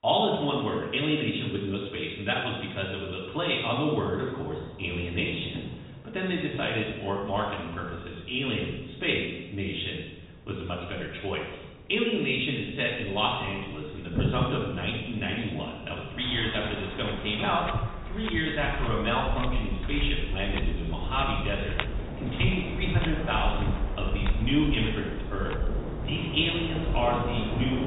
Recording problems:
off-mic speech; far
high frequencies cut off; severe; nothing above 4 kHz
room echo; noticeable; dies away in 1 s
rain or running water; loud; throughout; 5 dB below the speech

